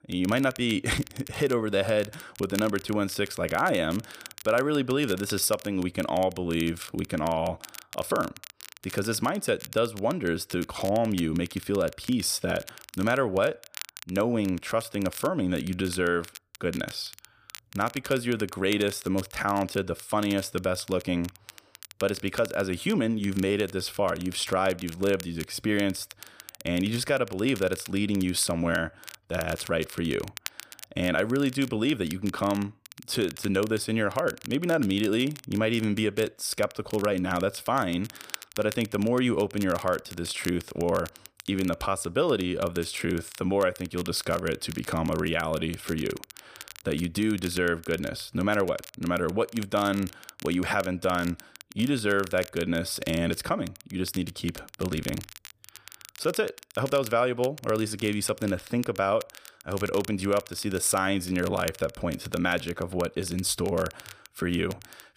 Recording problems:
crackle, like an old record; noticeable; 15 dB below the speech

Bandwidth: 15 kHz